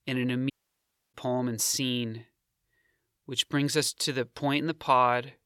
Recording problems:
audio cutting out; at 0.5 s for 0.5 s

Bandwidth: 17 kHz